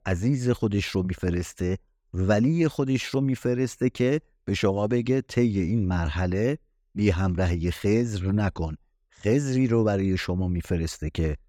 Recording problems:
none

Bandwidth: 18.5 kHz